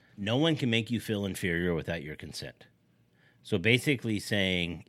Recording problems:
none

